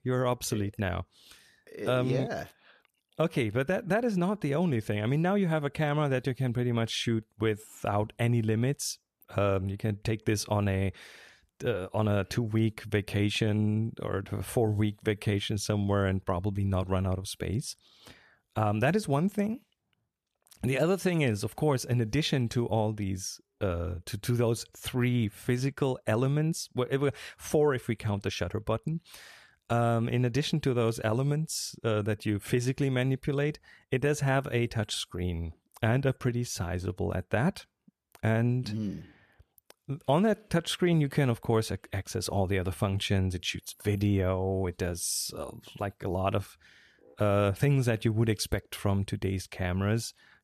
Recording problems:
none

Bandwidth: 14.5 kHz